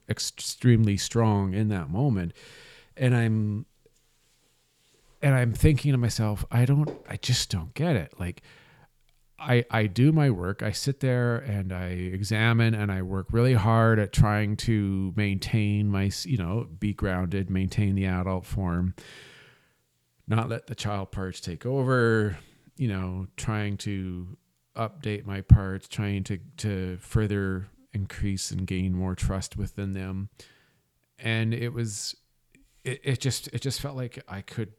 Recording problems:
none

